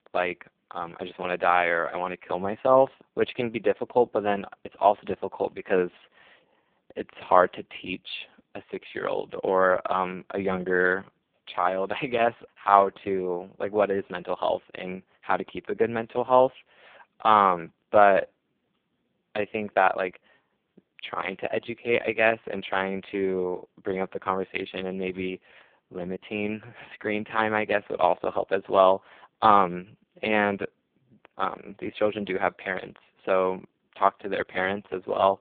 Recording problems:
phone-call audio; poor line; nothing above 3.5 kHz

